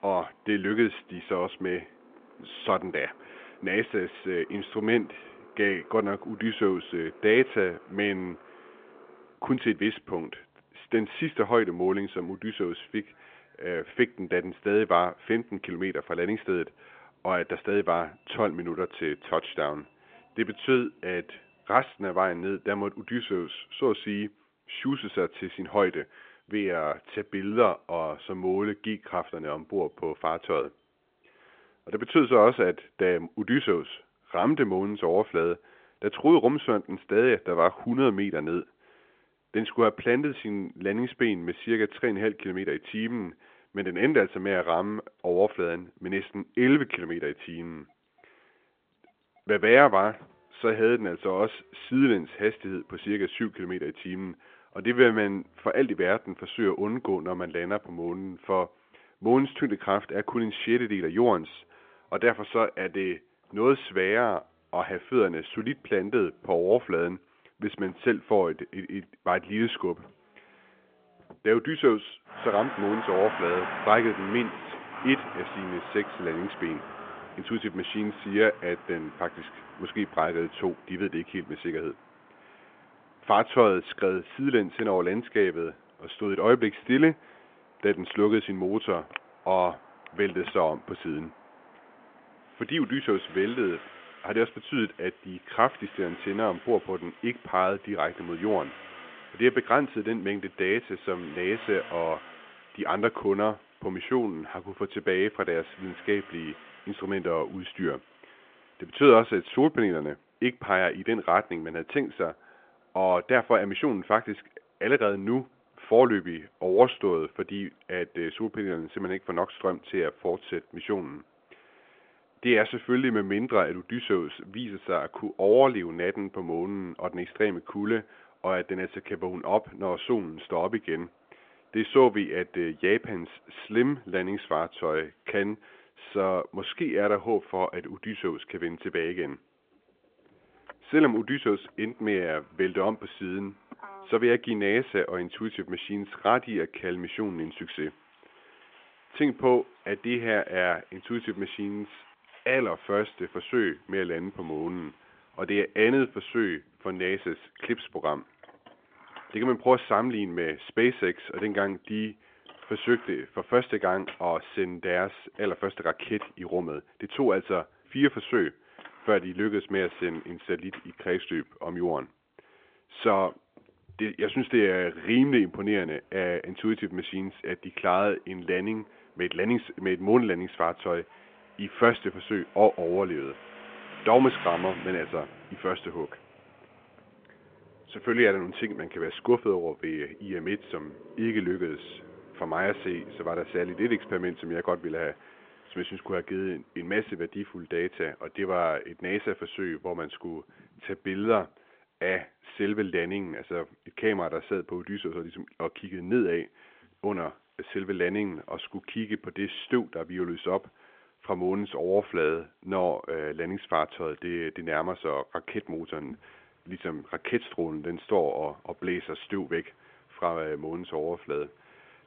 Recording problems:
phone-call audio; nothing above 3.5 kHz
traffic noise; noticeable; throughout; 20 dB below the speech

